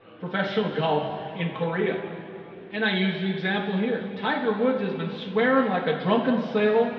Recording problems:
room echo; noticeable; dies away in 2.3 s
muffled; slightly; fading above 3.5 kHz
off-mic speech; somewhat distant
murmuring crowd; faint; throughout; 25 dB below the speech

